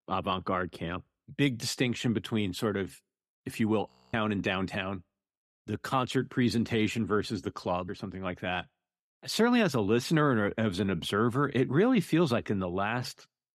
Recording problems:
audio freezing; at 4 s

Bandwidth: 14 kHz